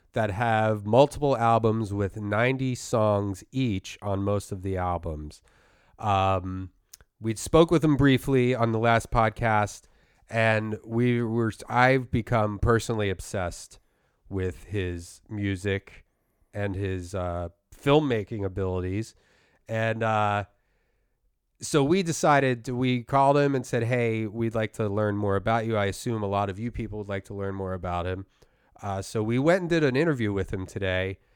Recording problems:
none

